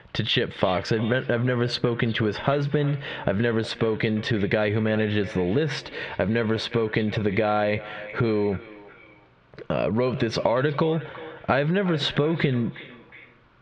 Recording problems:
squashed, flat; heavily
echo of what is said; noticeable; throughout; 360 ms later, 15 dB below the speech
muffled; very slightly; fading above 3.5 kHz

